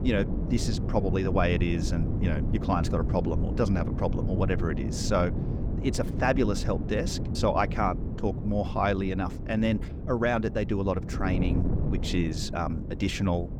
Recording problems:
wind noise on the microphone; occasional gusts; 10 dB below the speech

